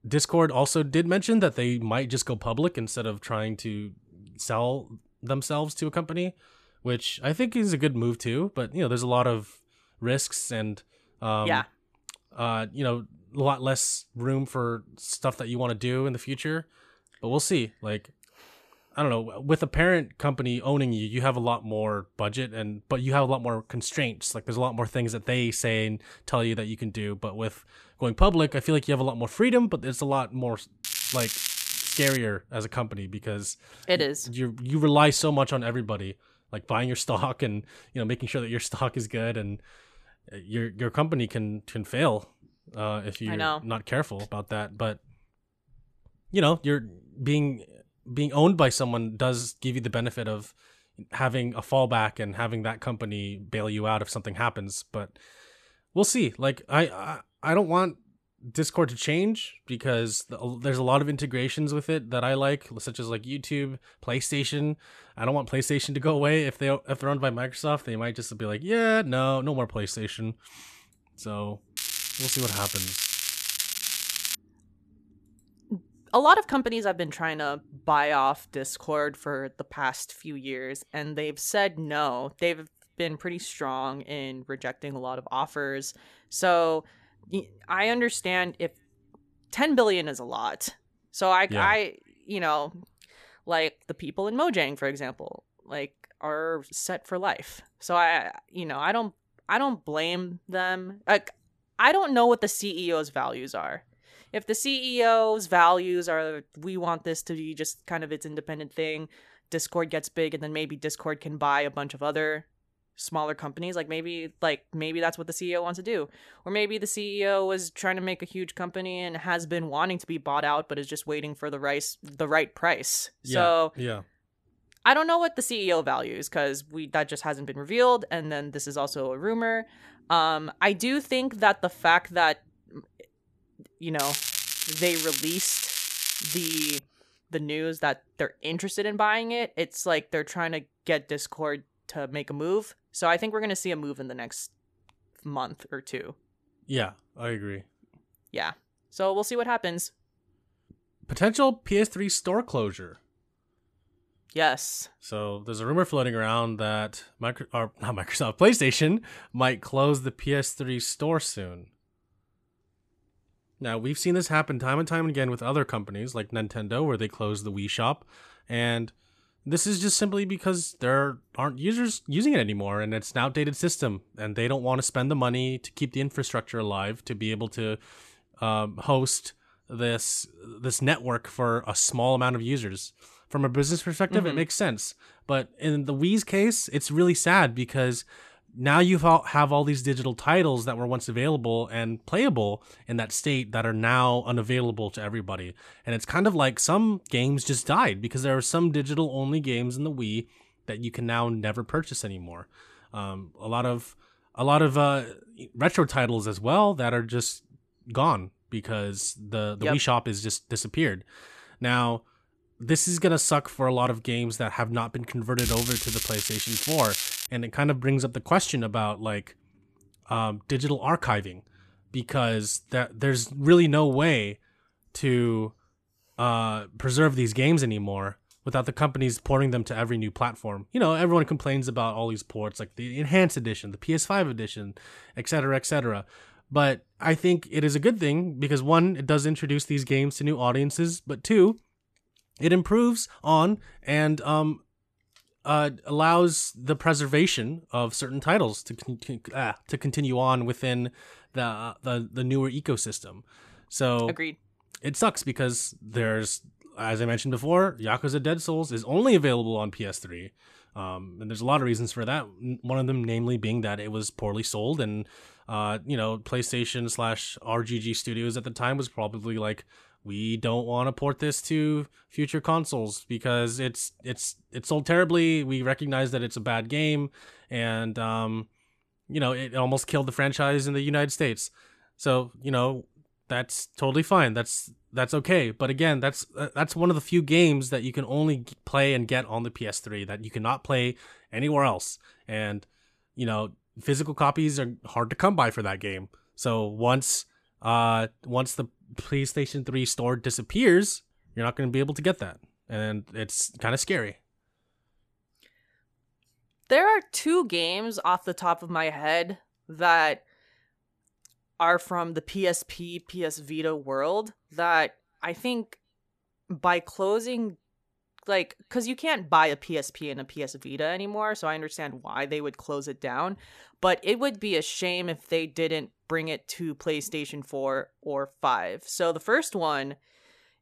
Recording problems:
crackling; loud; 4 times, first at 31 s; 1 dB below the speech

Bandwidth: 14 kHz